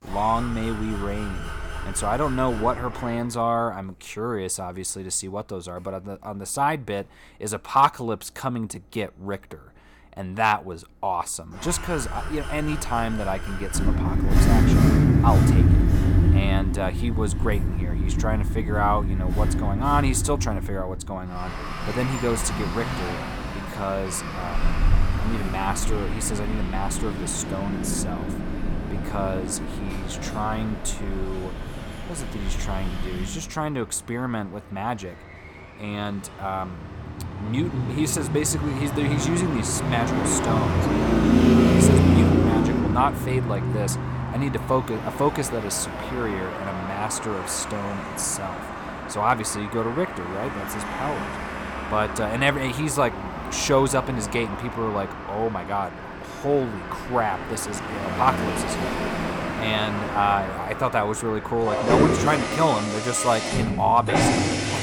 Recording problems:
traffic noise; very loud; throughout; 1 dB above the speech

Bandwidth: 18 kHz